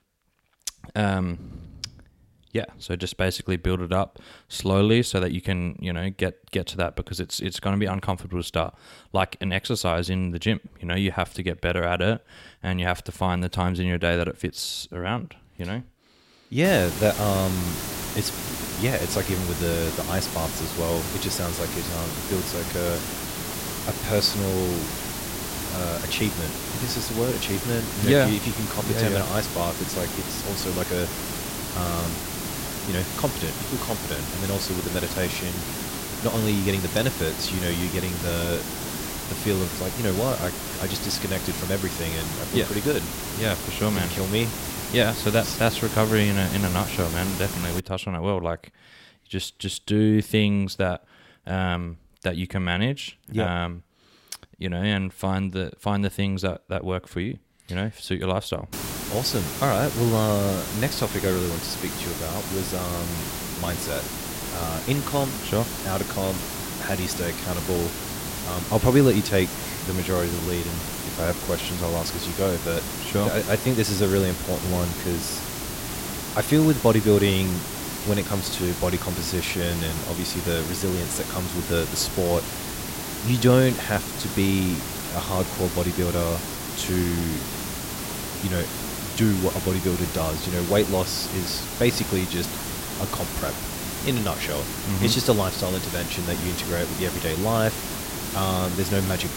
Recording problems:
hiss; loud; from 17 to 48 s and from 59 s on; 4 dB below the speech

